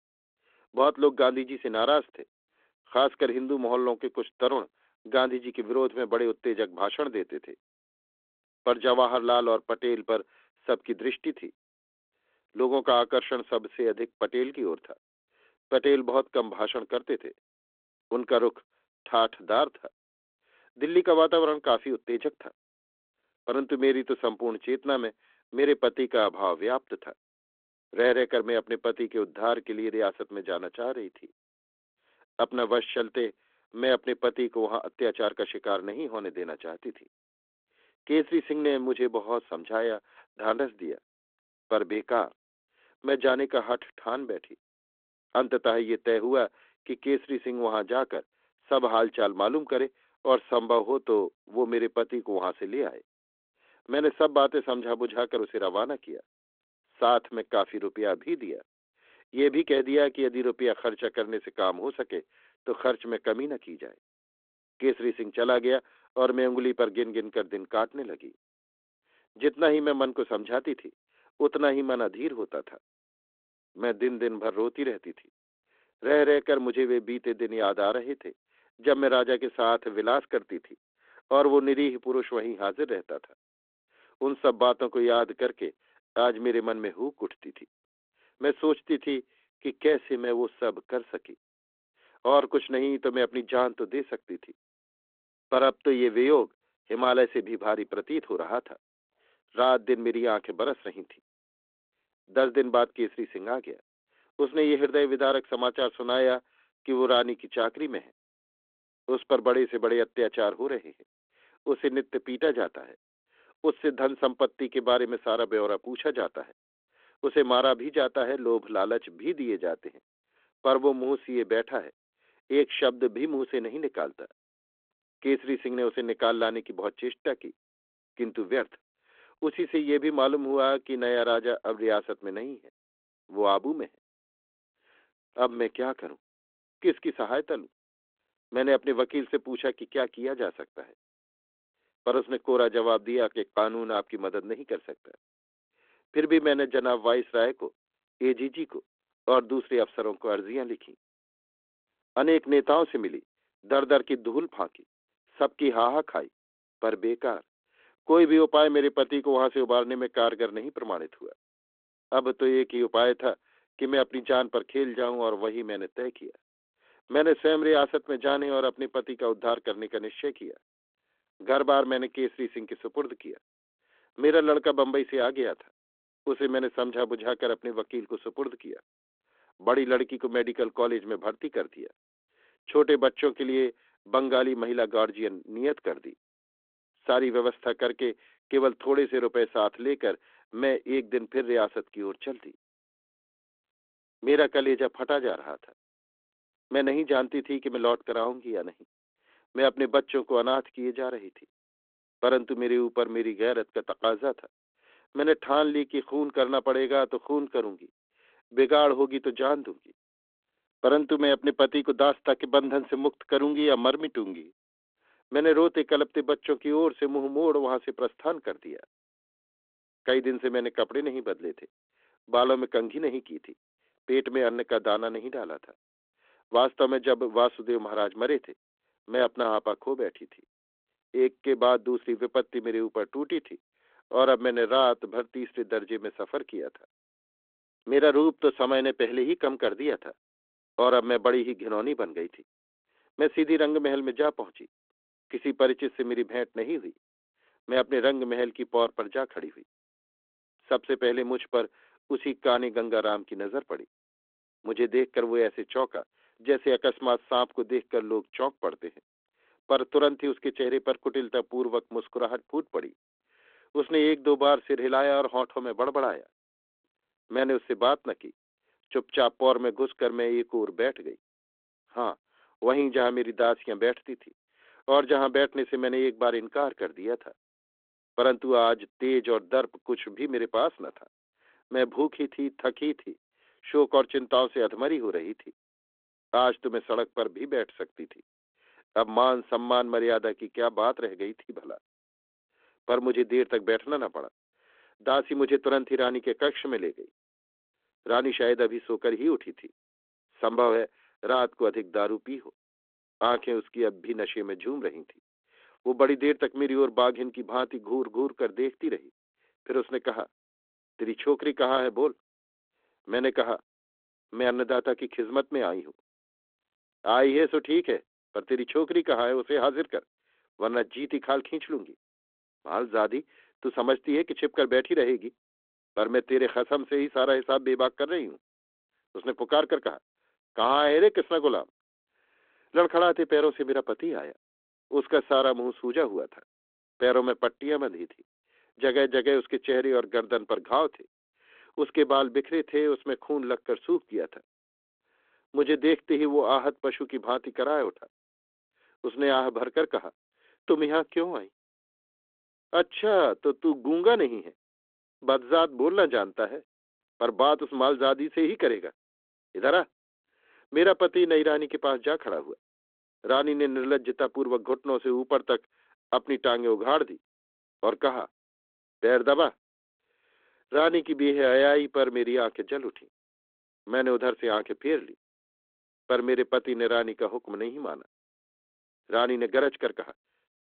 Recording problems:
phone-call audio; nothing above 3.5 kHz

